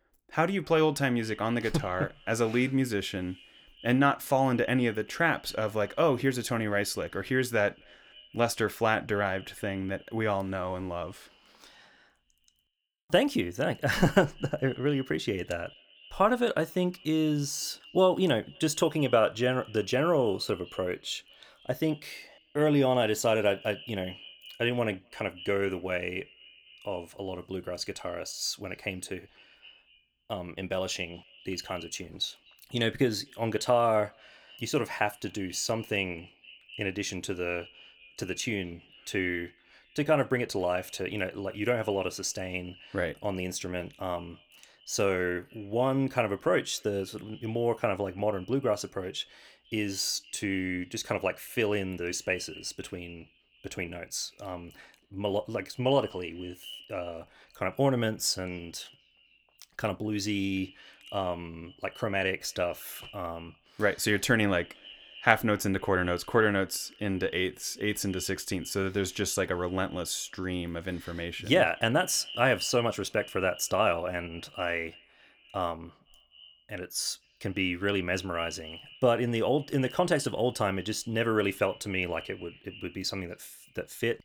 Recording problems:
echo of what is said; faint; throughout; 250 ms later, 20 dB below the speech

